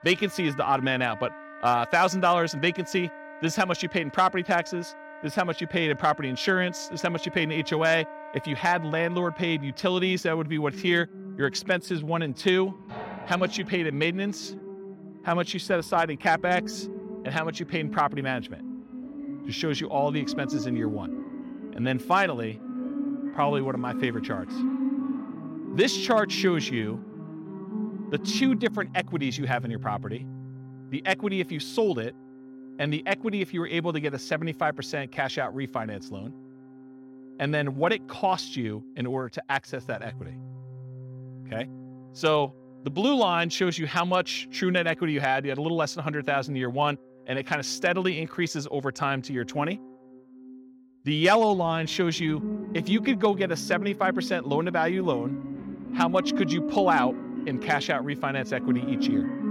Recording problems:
background music; loud; throughout; 10 dB below the speech

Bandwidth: 16.5 kHz